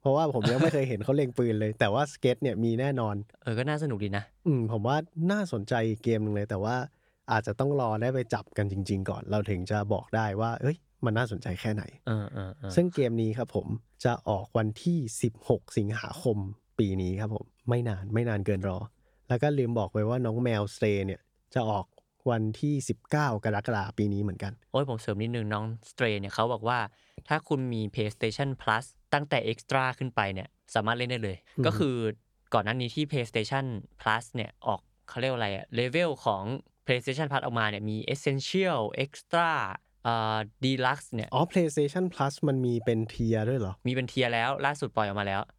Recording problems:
none

